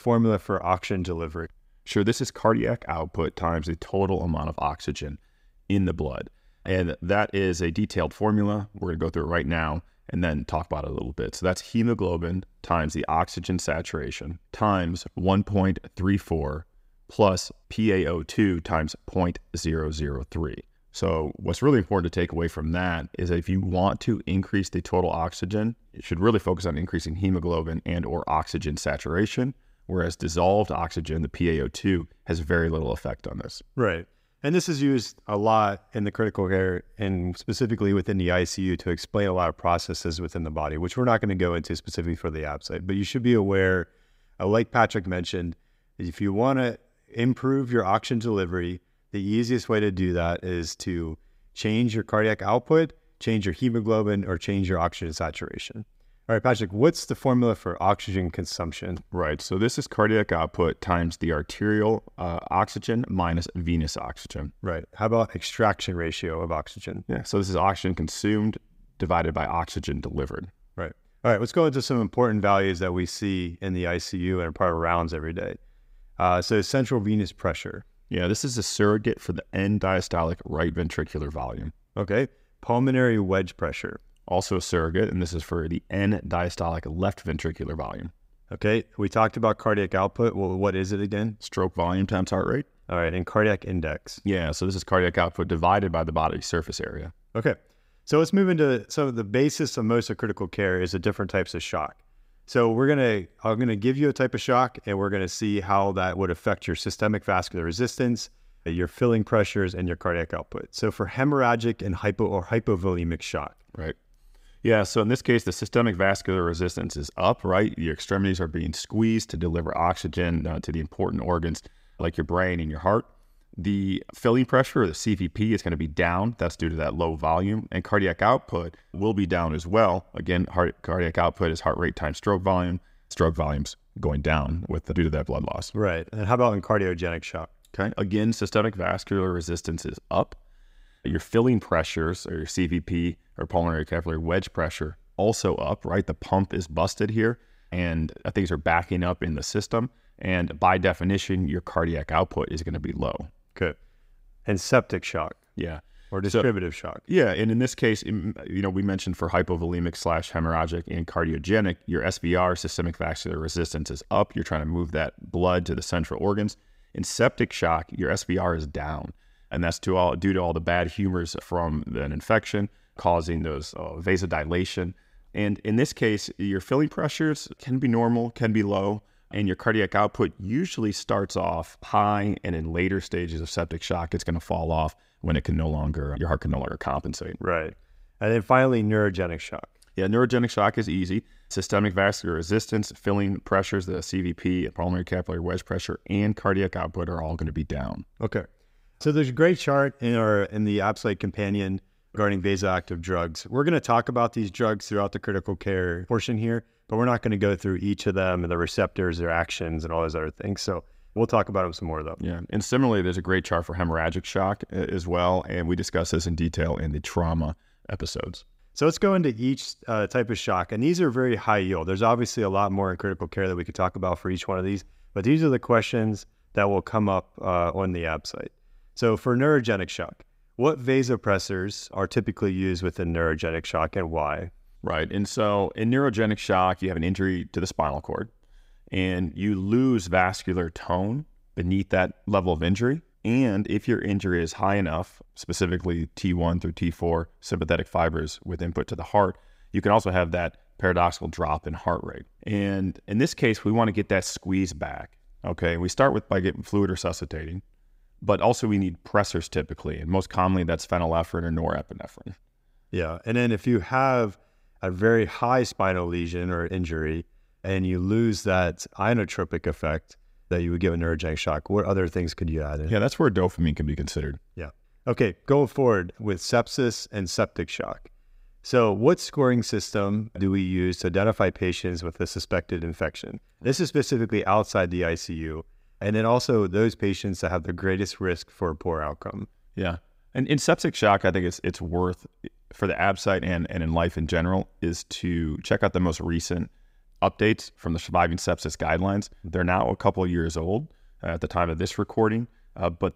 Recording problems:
none

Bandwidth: 15.5 kHz